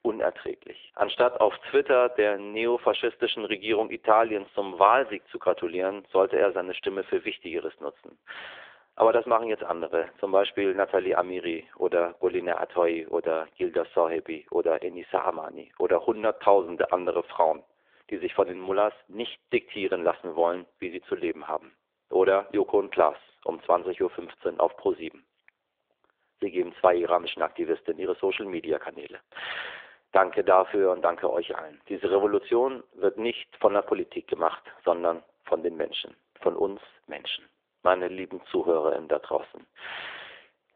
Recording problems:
phone-call audio; nothing above 3.5 kHz

